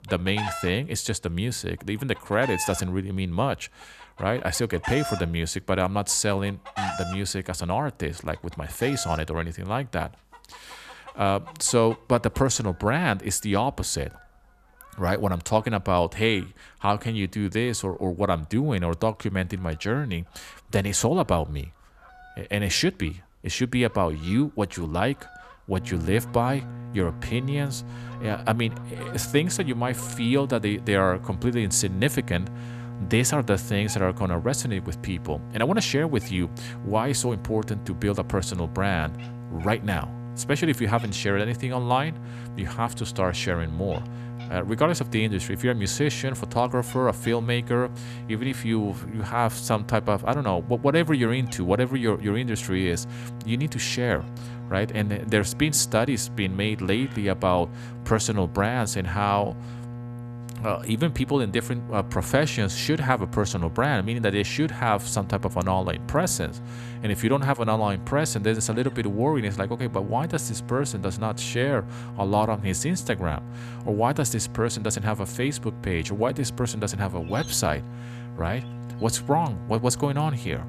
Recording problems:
electrical hum; noticeable; from 26 s on; 60 Hz, 20 dB below the speech
animal sounds; noticeable; throughout; 15 dB below the speech

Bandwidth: 14.5 kHz